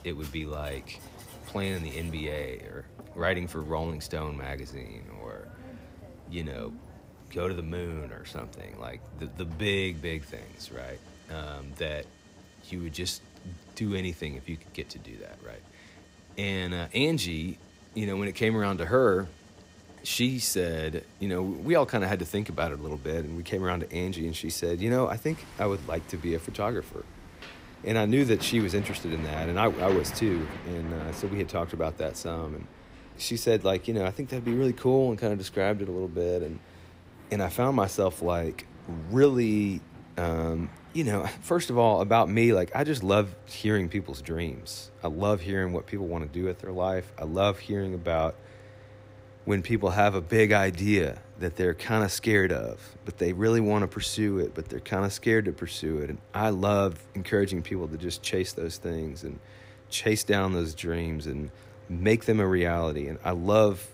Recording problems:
machinery noise; noticeable; throughout; 20 dB below the speech

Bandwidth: 15.5 kHz